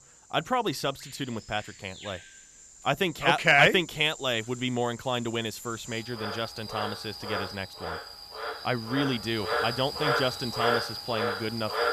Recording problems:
animal sounds; loud; throughout; 5 dB below the speech

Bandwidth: 14.5 kHz